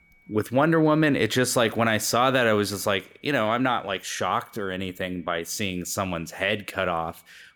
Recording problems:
high-pitched whine; faint; throughout; 2.5 kHz, 35 dB below the speech

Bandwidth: 18.5 kHz